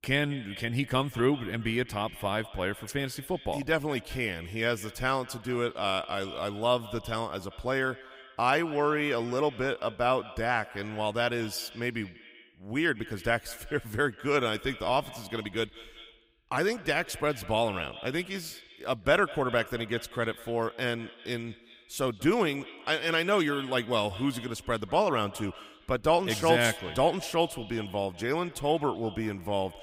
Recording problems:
echo of what is said; noticeable; throughout; 190 ms later, 15 dB below the speech

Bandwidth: 15.5 kHz